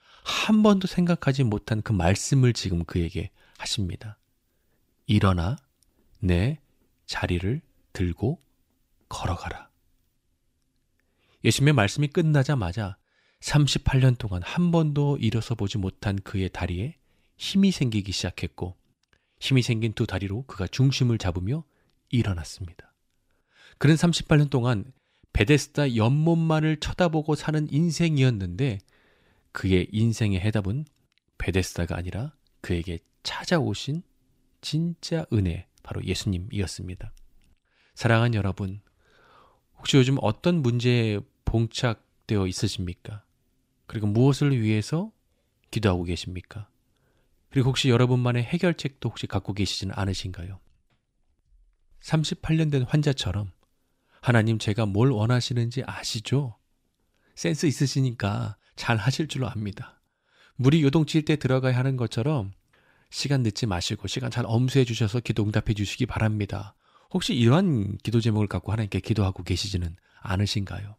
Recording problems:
none

